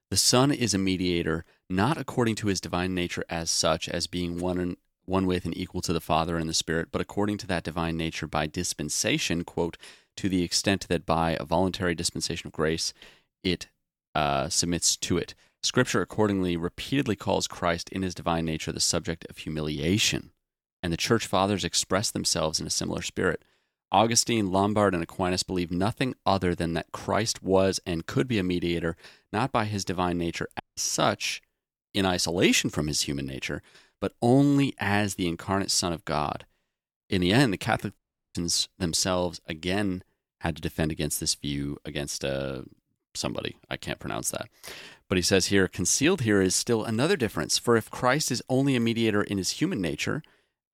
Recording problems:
audio cutting out; at 31 s and at 38 s

